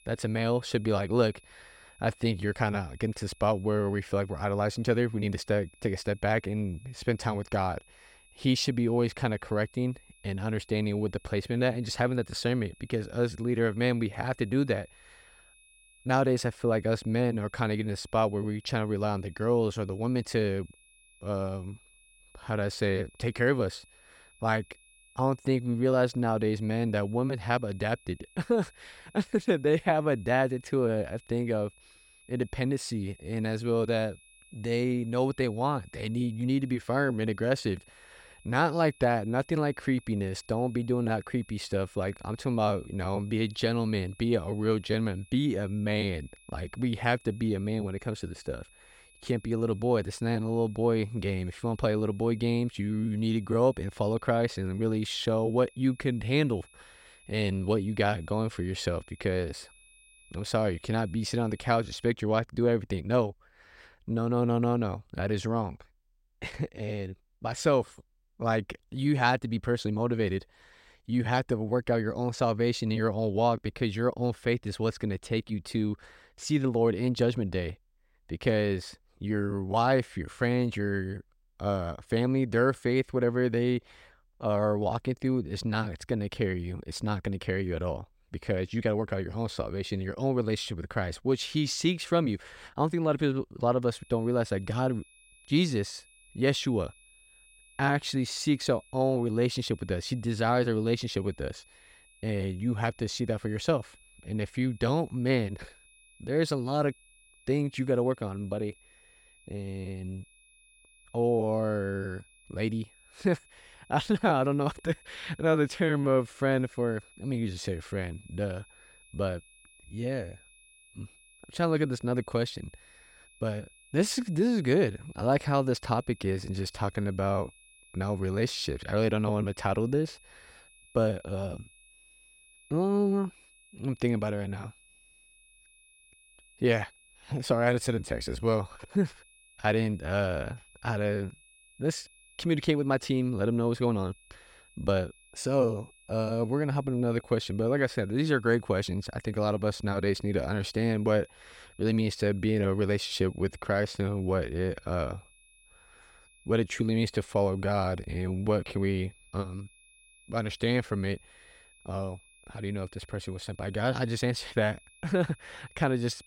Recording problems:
high-pitched whine; faint; until 1:02 and from 1:34 on; 2.5 kHz, 30 dB below the speech

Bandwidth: 16 kHz